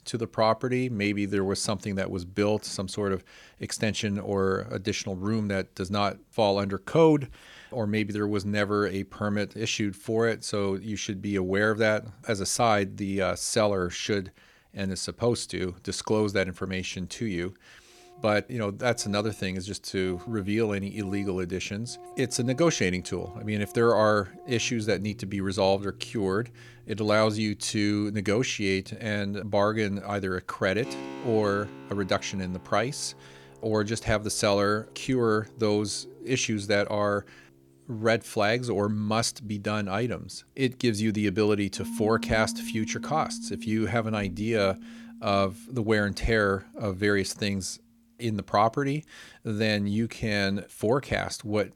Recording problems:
background music; noticeable; from 18 s on; 15 dB below the speech

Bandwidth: 18.5 kHz